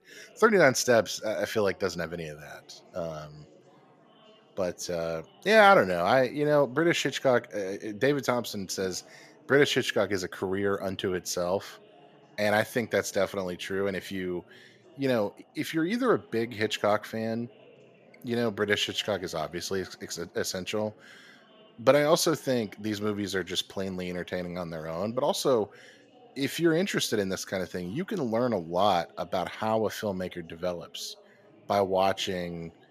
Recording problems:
chatter from many people; faint; throughout; 30 dB below the speech

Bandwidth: 14.5 kHz